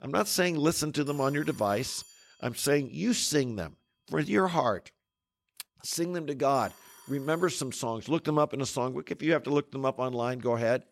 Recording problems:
alarms or sirens; faint; throughout; 20 dB below the speech

